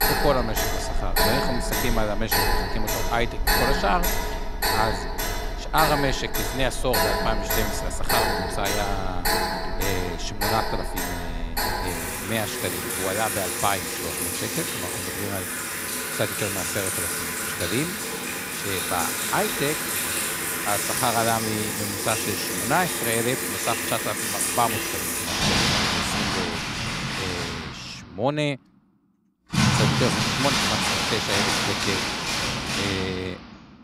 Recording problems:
household noises; very loud; throughout; 4 dB above the speech

